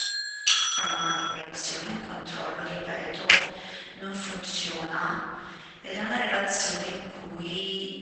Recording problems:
room echo; strong; dies away in 1.6 s
off-mic speech; far
garbled, watery; badly; nothing above 8 kHz
thin; somewhat; fading below 800 Hz
doorbell; loud; until 1.5 s; peak 10 dB above the speech
keyboard typing; loud; at 3.5 s; peak 10 dB above the speech

